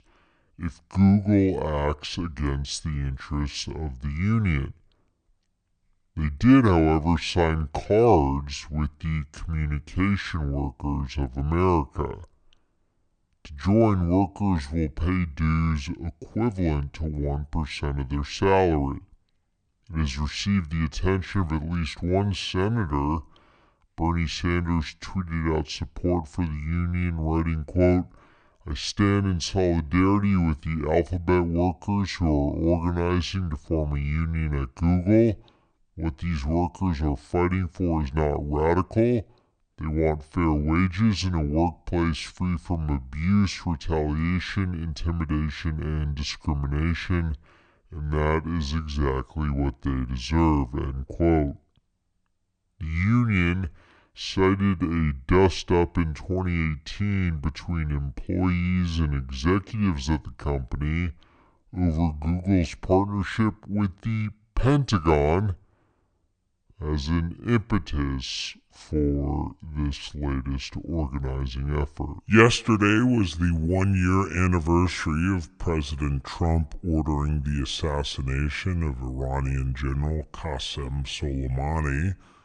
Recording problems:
wrong speed and pitch; too slow and too low; 0.7 times normal speed

